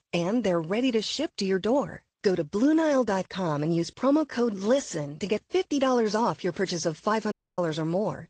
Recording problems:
garbled, watery; slightly
audio cutting out; at 7.5 s

